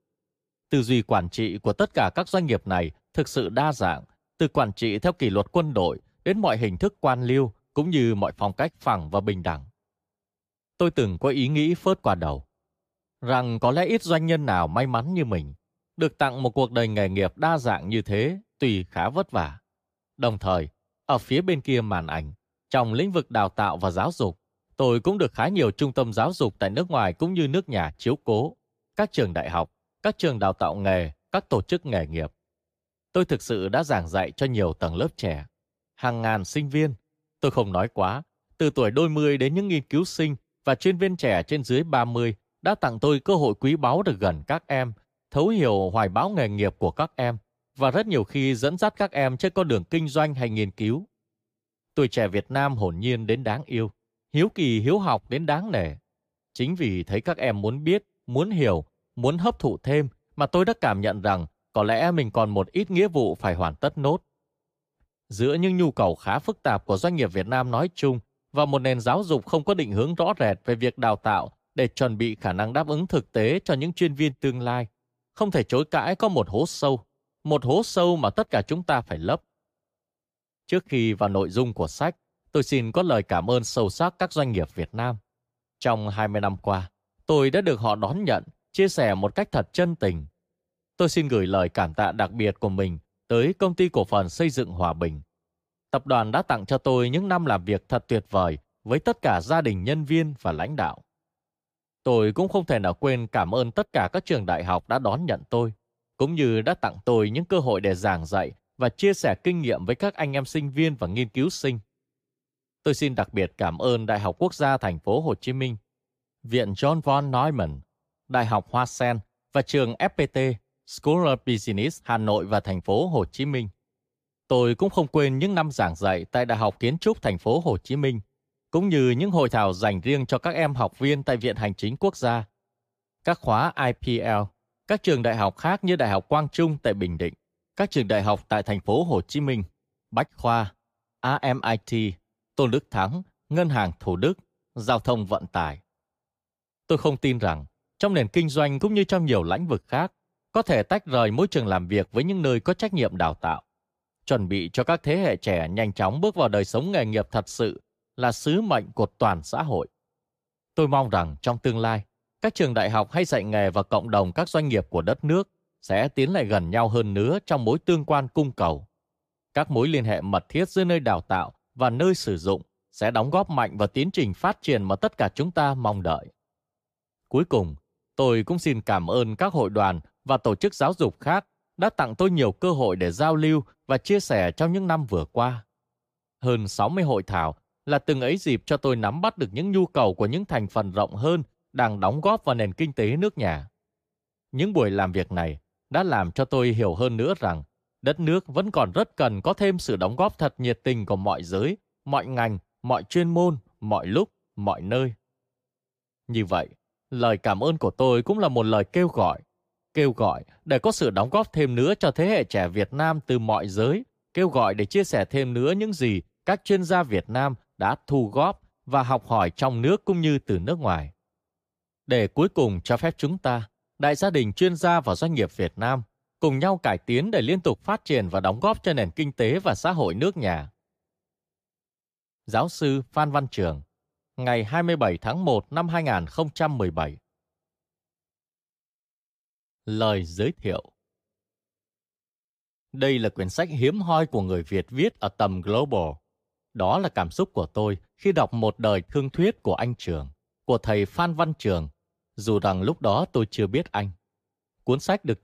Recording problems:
none

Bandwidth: 15 kHz